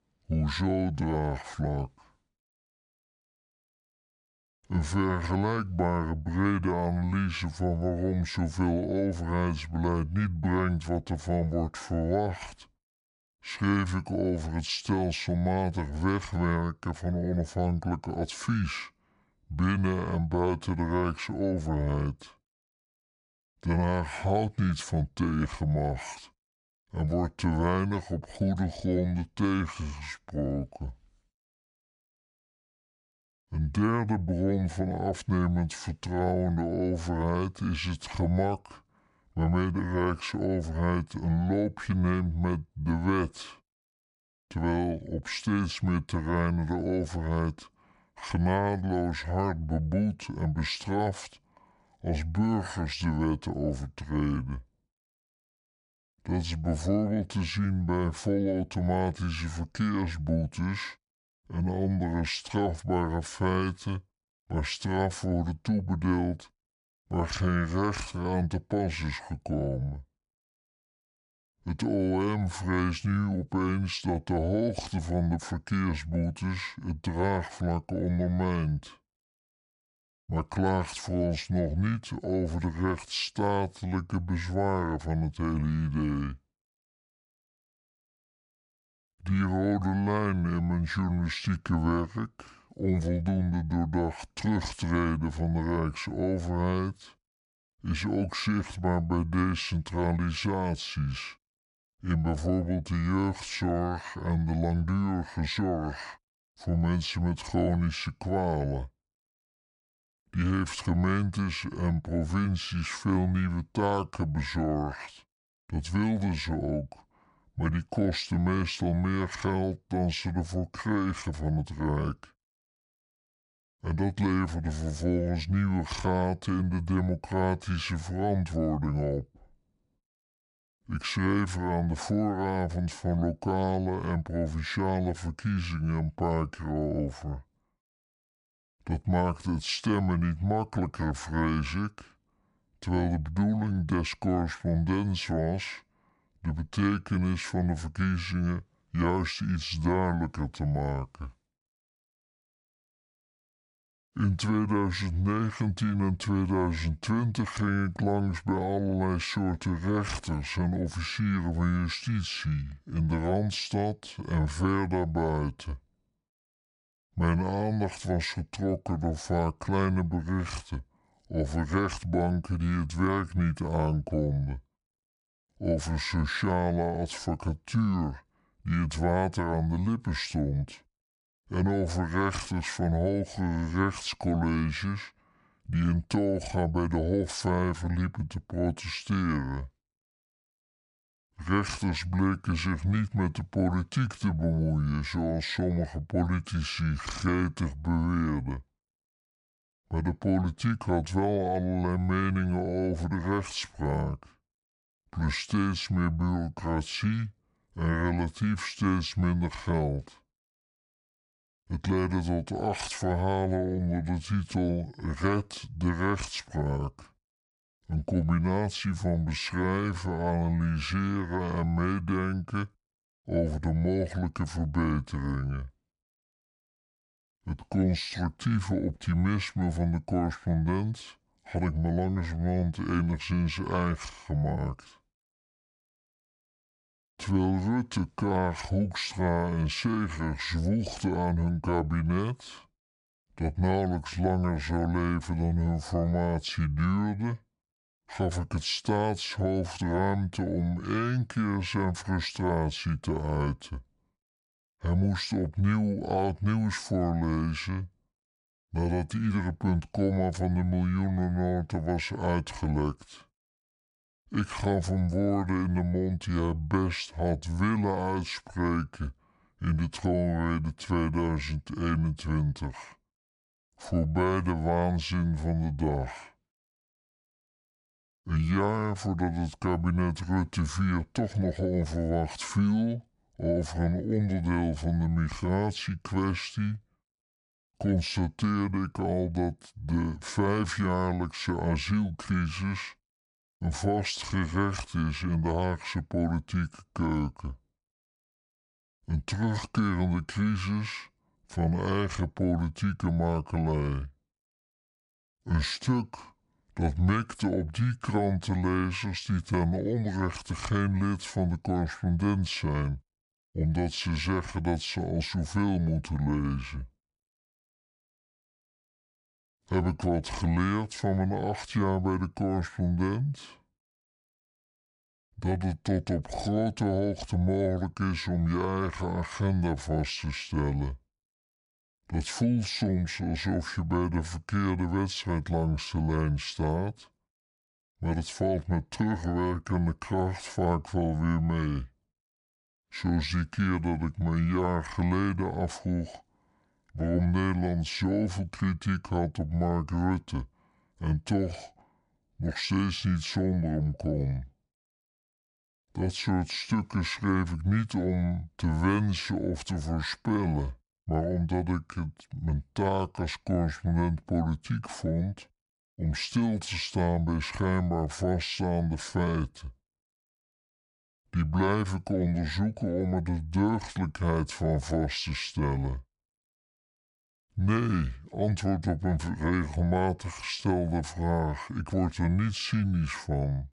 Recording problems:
wrong speed and pitch; too slow and too low; 0.7 times normal speed

